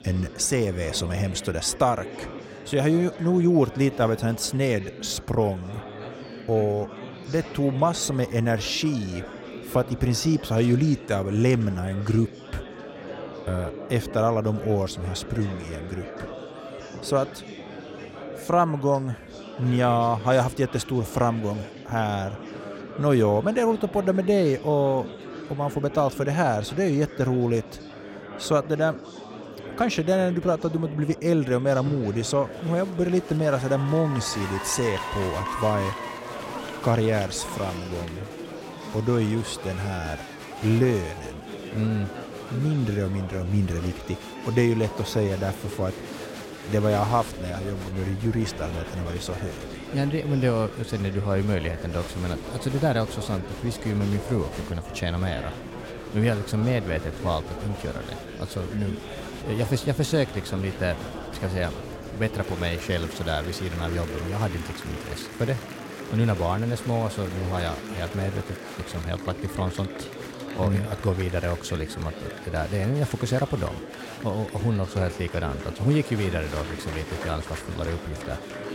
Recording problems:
murmuring crowd; noticeable; throughout; 10 dB below the speech

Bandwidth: 16 kHz